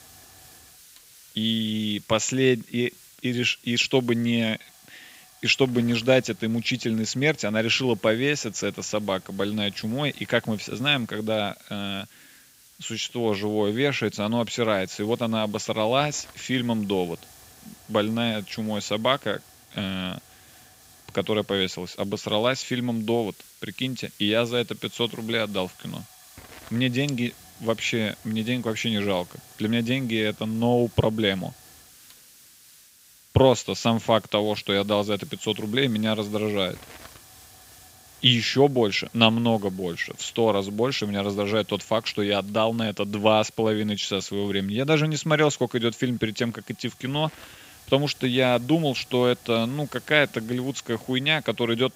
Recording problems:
high frequencies cut off; noticeable; nothing above 7.5 kHz
hiss; faint; throughout; 25 dB below the speech

